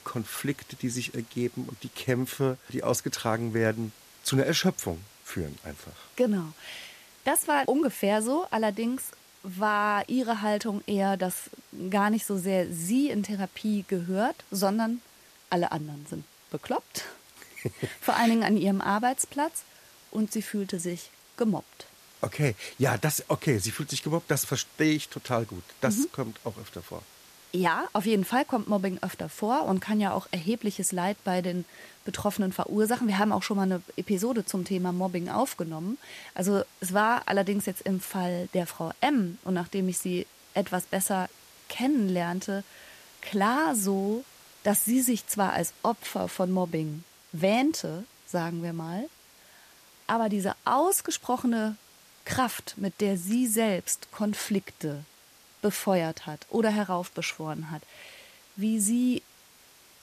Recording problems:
hiss; faint; throughout; 25 dB below the speech

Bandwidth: 14.5 kHz